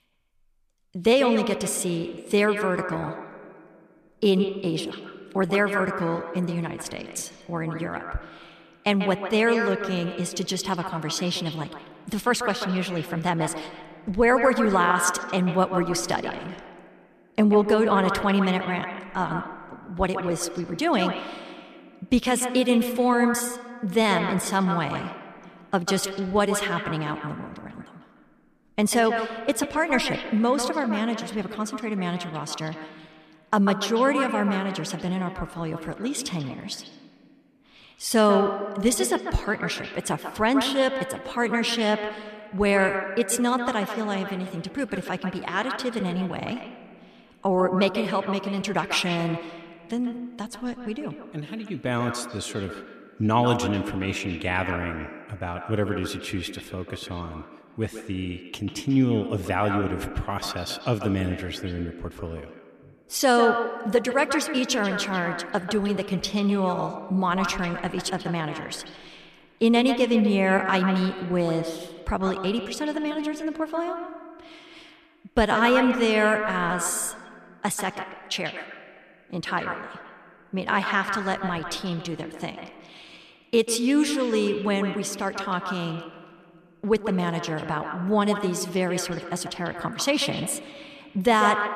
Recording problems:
echo of what is said; strong; throughout; 140 ms later, 7 dB below the speech

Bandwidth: 14.5 kHz